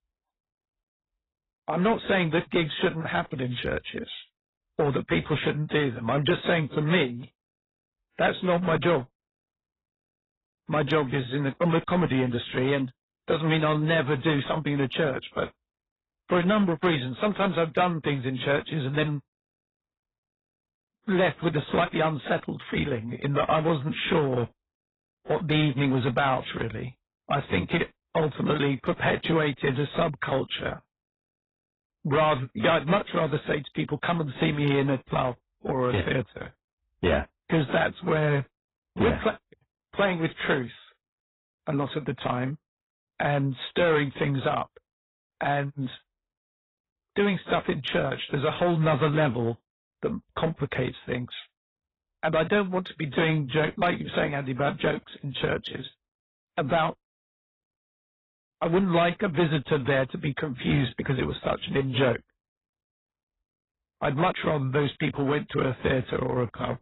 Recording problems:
garbled, watery; badly; nothing above 4 kHz
distortion; slight; 4% of the sound clipped

